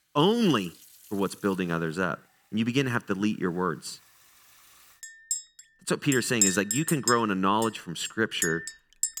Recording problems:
household noises; loud; throughout; 3 dB below the speech

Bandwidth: 19 kHz